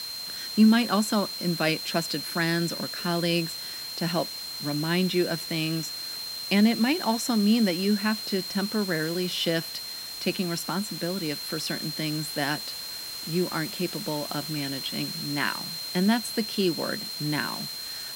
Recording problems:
high-pitched whine; loud; throughout; 4 kHz, 6 dB below the speech
hiss; noticeable; throughout; 10 dB below the speech

